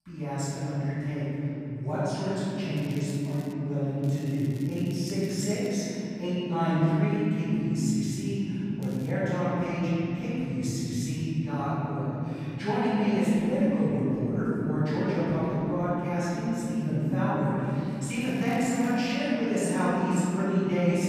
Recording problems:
room echo; strong; dies away in 3 s
off-mic speech; far
crackling; faint; 4 times, first at 3 s; 25 dB below the speech

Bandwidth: 15 kHz